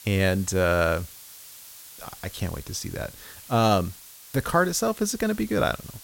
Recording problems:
hiss; noticeable; throughout; 15 dB below the speech

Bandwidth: 16.5 kHz